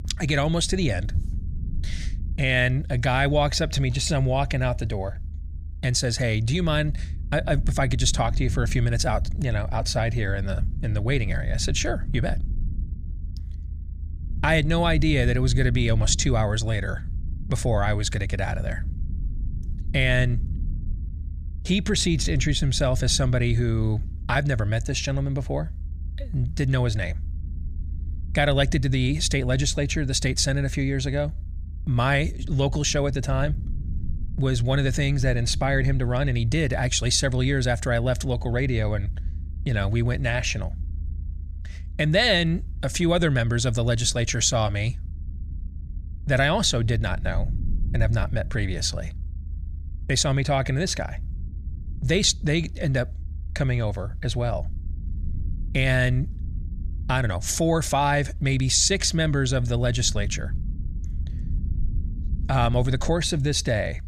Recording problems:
low rumble; faint; throughout; 25 dB below the speech

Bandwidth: 15 kHz